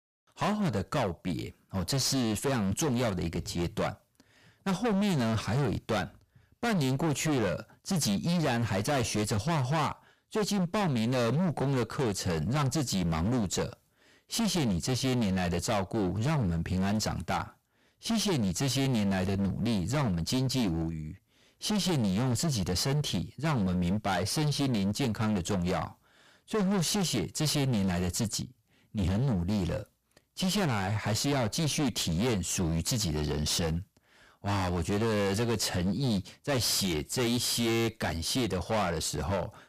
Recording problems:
distortion; heavy; 25% of the sound clipped

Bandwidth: 15 kHz